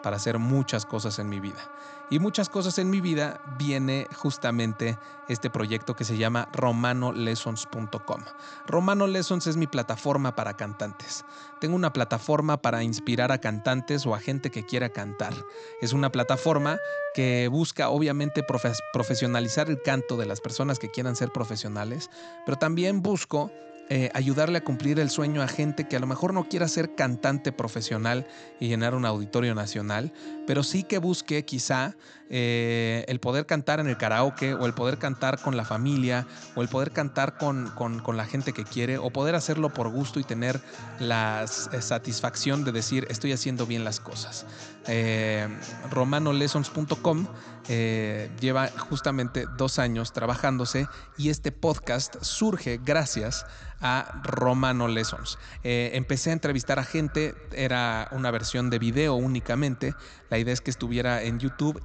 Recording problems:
high frequencies cut off; noticeable; nothing above 8 kHz
echo of what is said; faint; from 34 s on; 190 ms later, 20 dB below the speech
background music; noticeable; throughout; 15 dB below the speech

